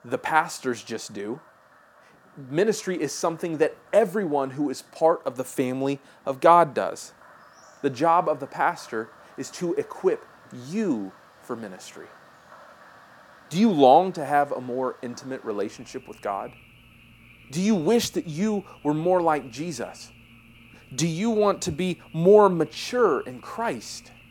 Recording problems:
animal sounds; faint; throughout; 25 dB below the speech

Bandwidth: 17.5 kHz